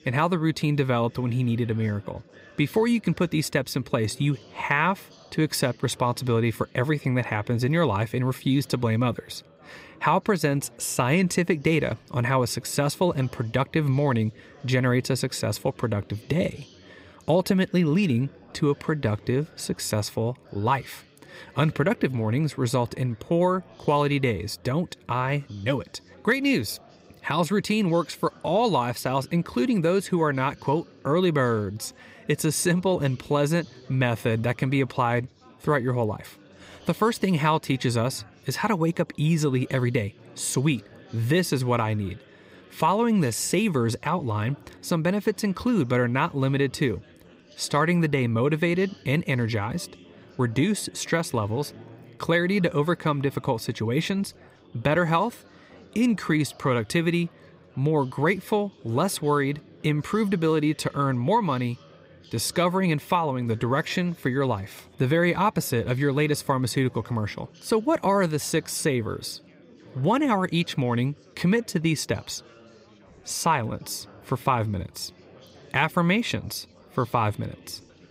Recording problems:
chatter from many people; faint; throughout; 25 dB below the speech

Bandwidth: 15.5 kHz